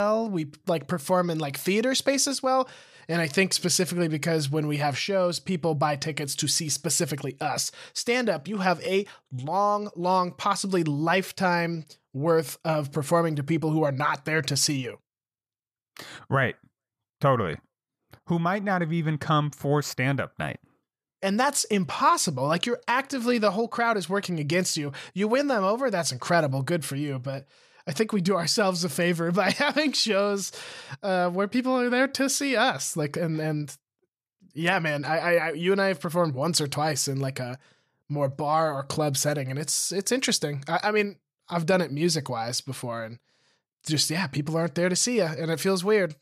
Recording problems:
abrupt cut into speech; at the start

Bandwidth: 14.5 kHz